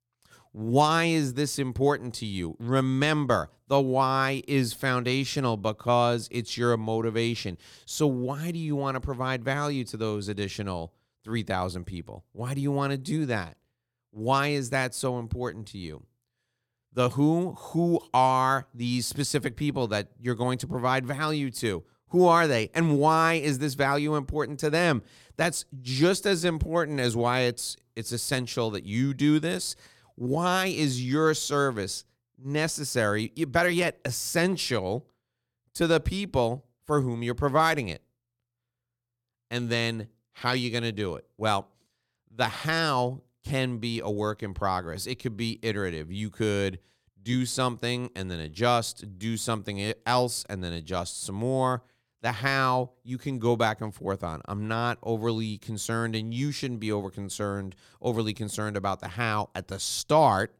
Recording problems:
none

